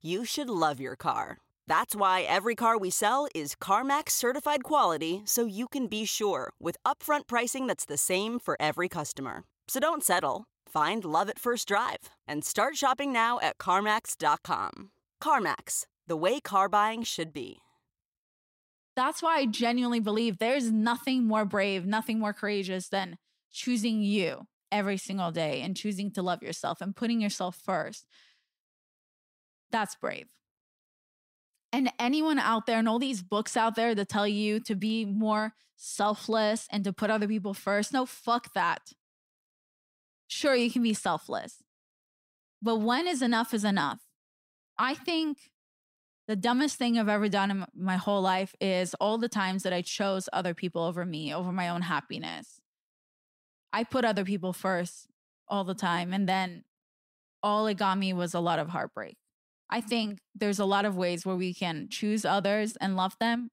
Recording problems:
none

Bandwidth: 16 kHz